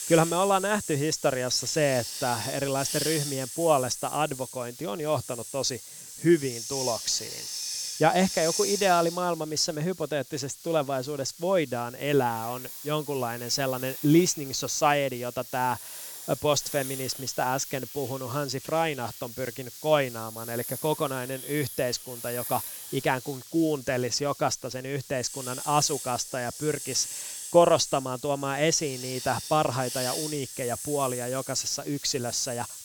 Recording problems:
hiss; loud; throughout; 8 dB below the speech

